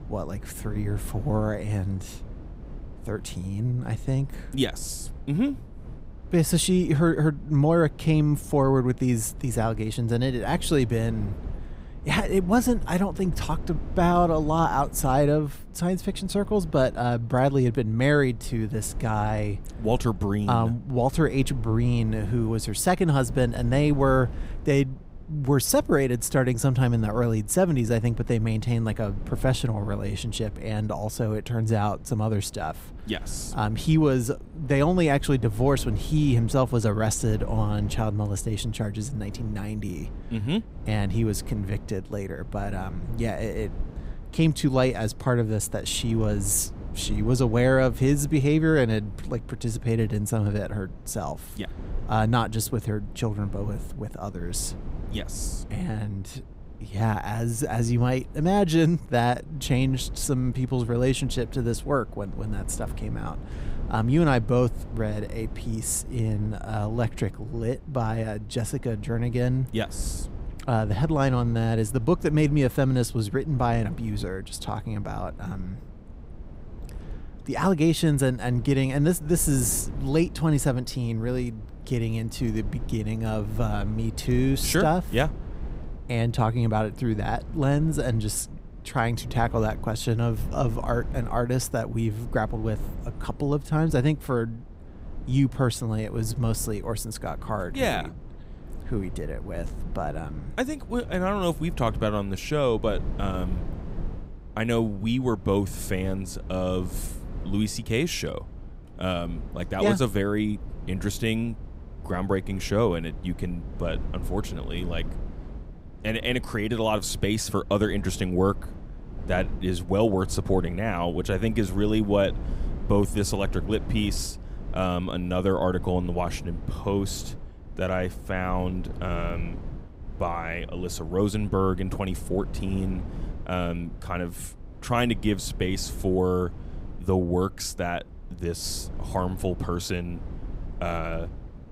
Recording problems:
low rumble; noticeable; throughout; 20 dB below the speech

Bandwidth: 15.5 kHz